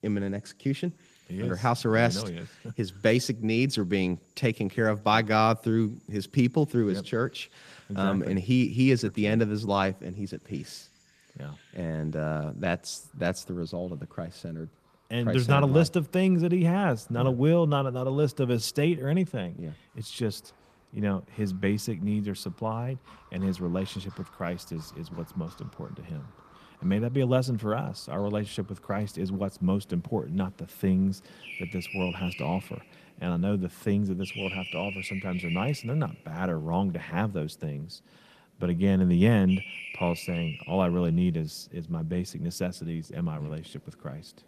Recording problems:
garbled, watery; slightly; nothing above 14.5 kHz
animal sounds; noticeable; throughout; 10 dB below the speech

